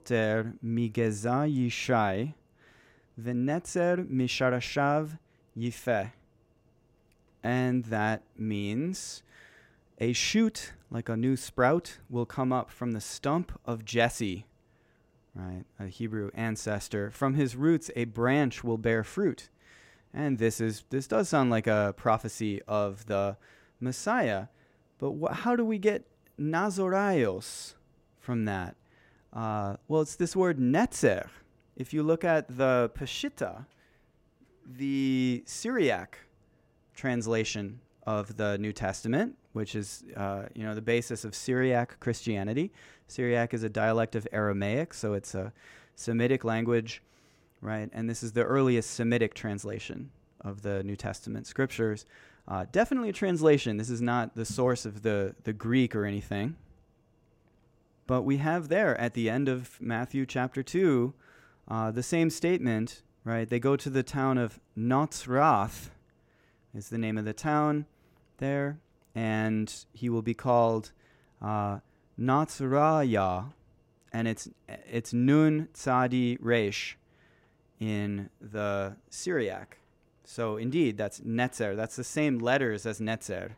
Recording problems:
none

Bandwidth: 16 kHz